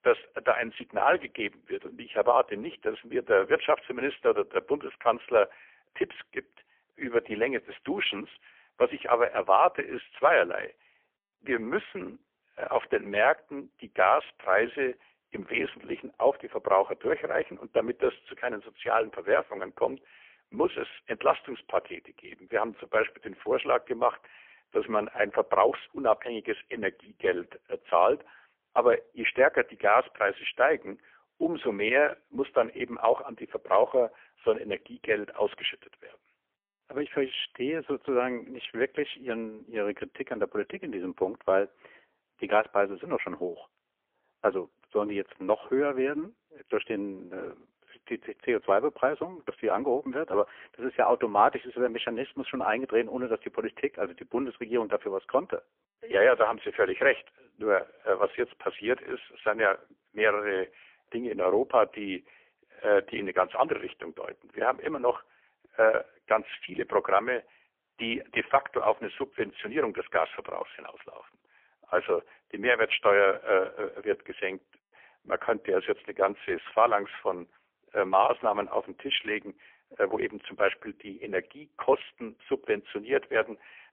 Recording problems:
phone-call audio; poor line; nothing above 3.5 kHz

